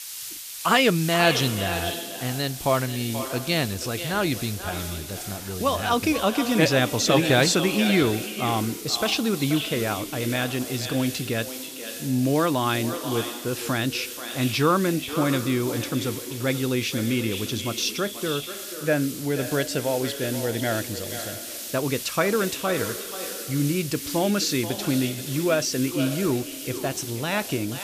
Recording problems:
echo of what is said; strong; throughout; 480 ms later, 9 dB below the speech
hiss; loud; throughout; 9 dB below the speech

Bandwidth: 14.5 kHz